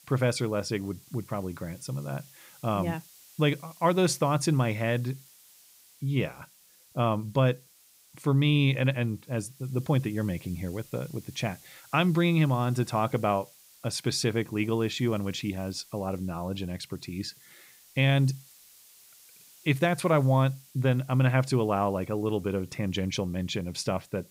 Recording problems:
hiss; faint; throughout; 25 dB below the speech

